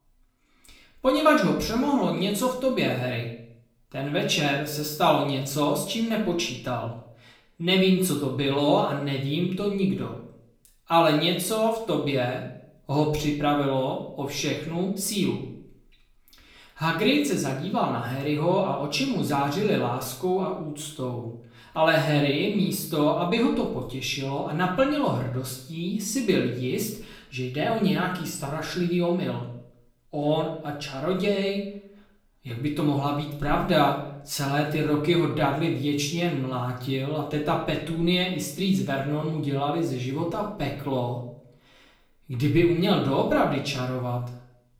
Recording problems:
off-mic speech; far
room echo; slight; dies away in 0.5 s

